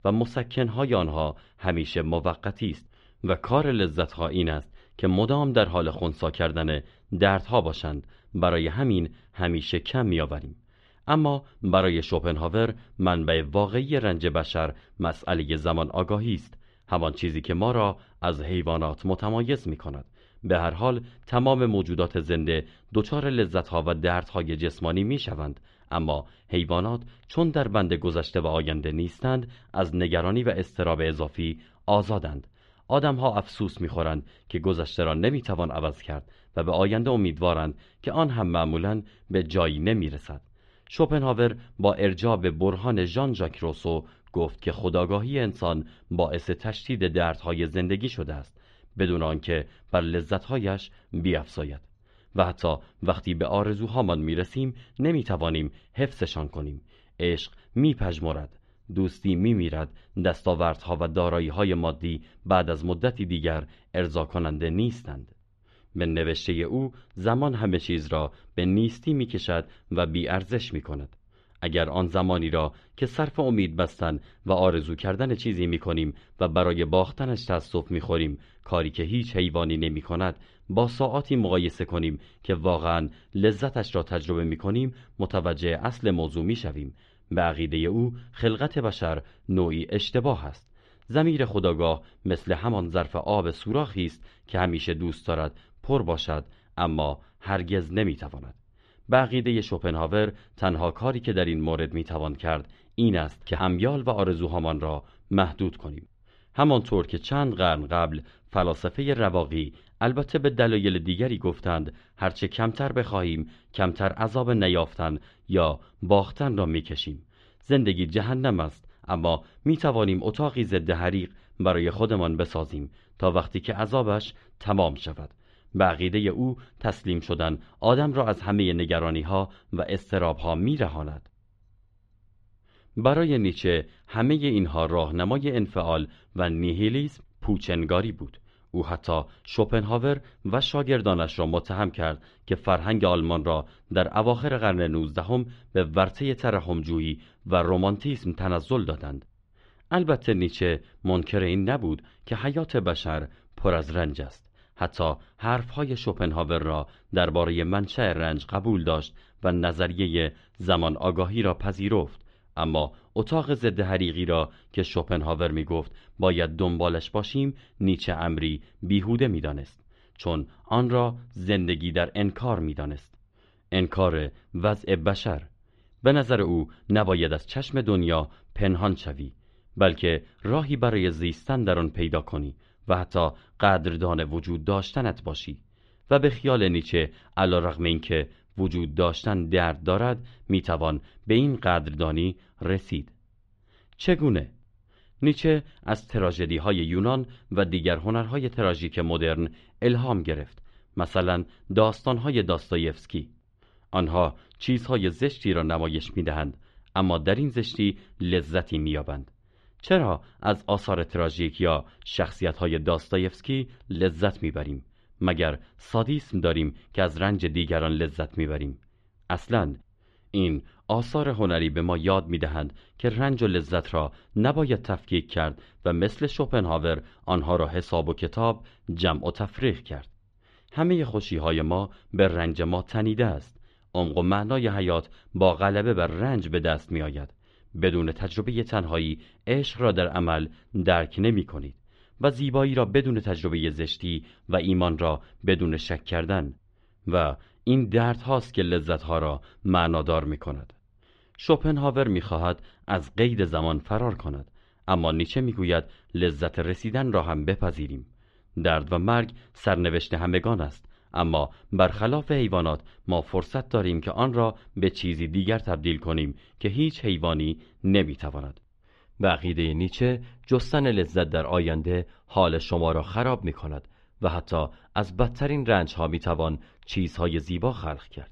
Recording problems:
muffled; slightly; fading above 3.5 kHz

